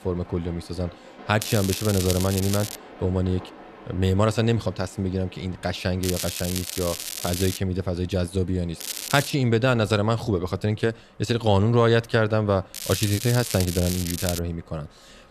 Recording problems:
crackling; loud; 4 times, first at 1.5 s; 6 dB below the speech
train or aircraft noise; faint; throughout; 25 dB below the speech

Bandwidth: 14 kHz